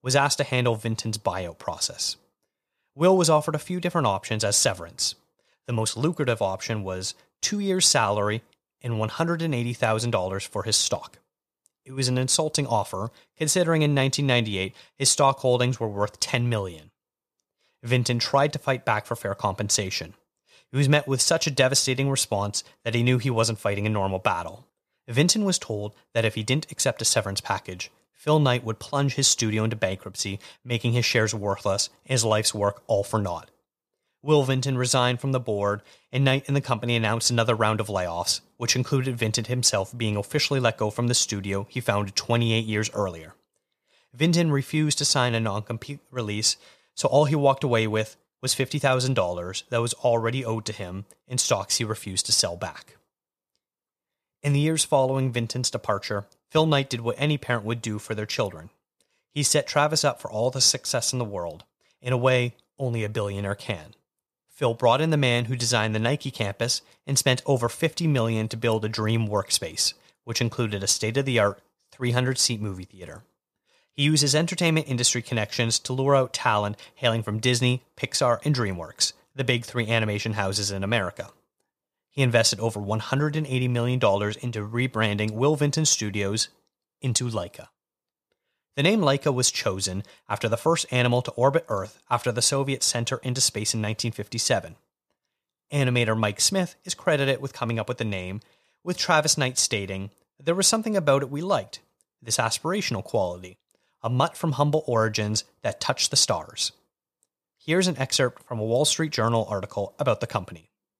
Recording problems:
none

